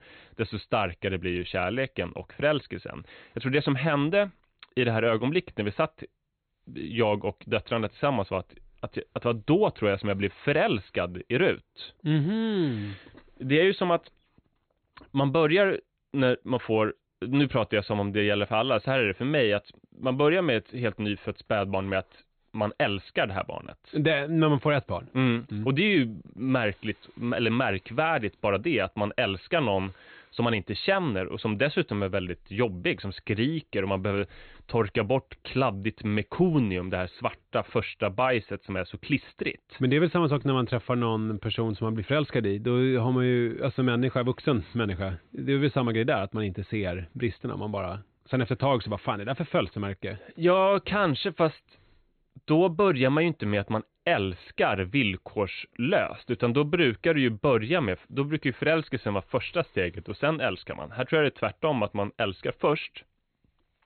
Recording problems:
high frequencies cut off; severe; nothing above 4 kHz

